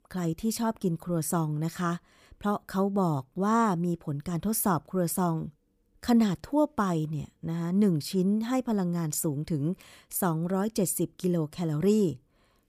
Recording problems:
none

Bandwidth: 15 kHz